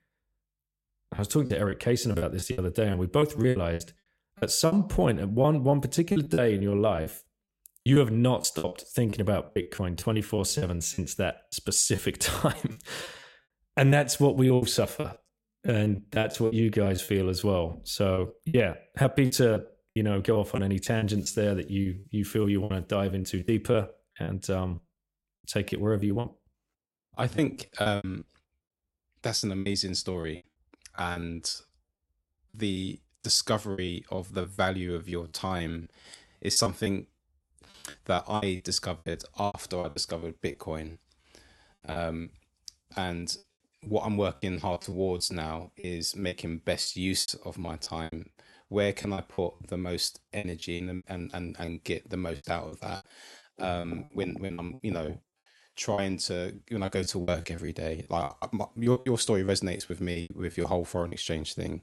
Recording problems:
choppy; very; 14% of the speech affected

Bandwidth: 16 kHz